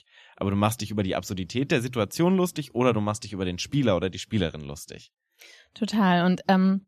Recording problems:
none

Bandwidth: 14 kHz